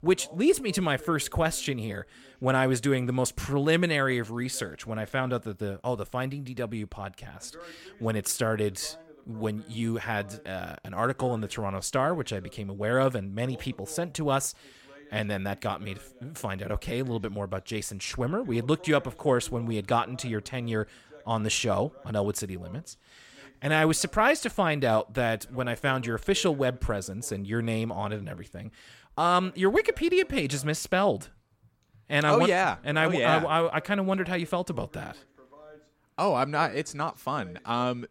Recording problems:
voice in the background; faint; throughout; 25 dB below the speech

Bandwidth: 17 kHz